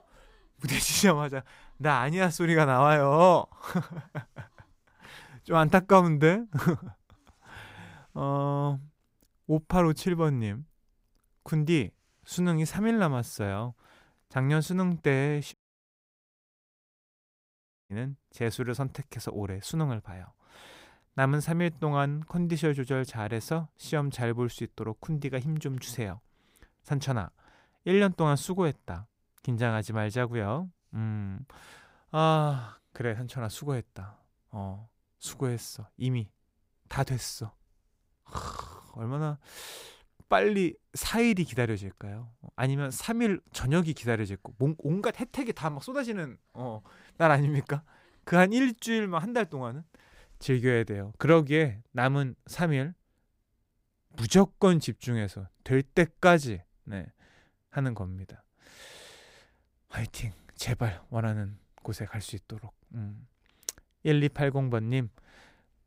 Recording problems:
audio cutting out; at 16 s for 2.5 s

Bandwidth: 15.5 kHz